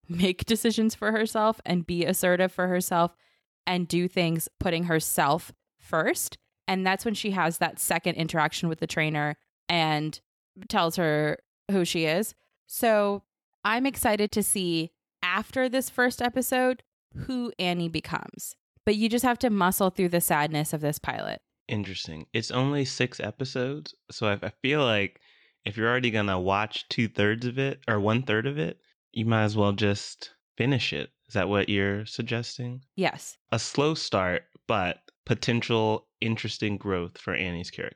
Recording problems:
none

